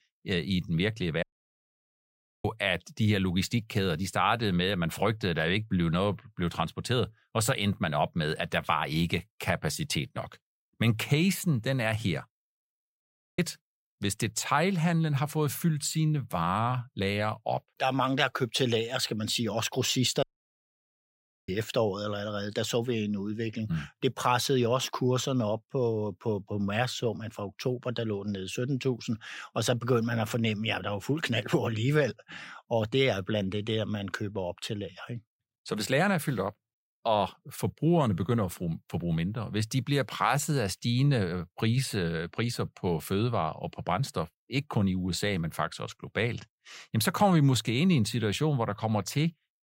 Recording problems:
audio cutting out; at 1 s for 1 s, at 13 s and at 20 s for 1.5 s

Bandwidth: 16 kHz